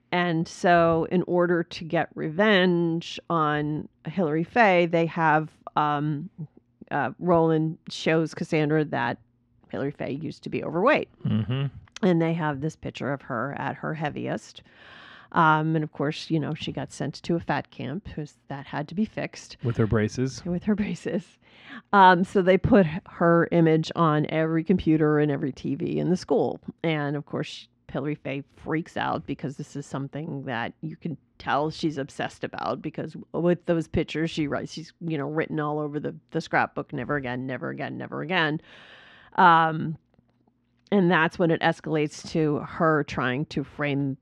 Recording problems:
muffled; slightly; fading above 3 kHz

